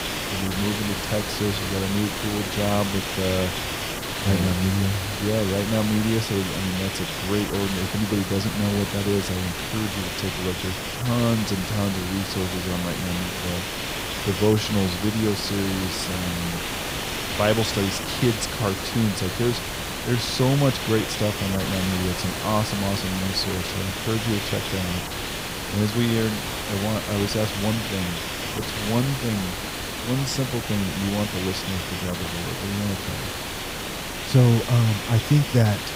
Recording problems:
hiss; loud; throughout; 3 dB below the speech

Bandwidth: 15.5 kHz